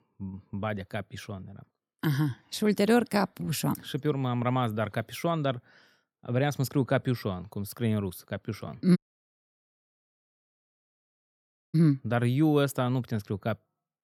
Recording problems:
audio cutting out; at 9 s for 3 s

